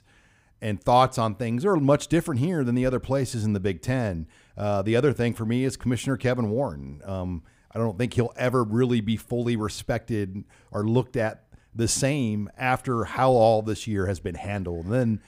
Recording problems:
none

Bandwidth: 15.5 kHz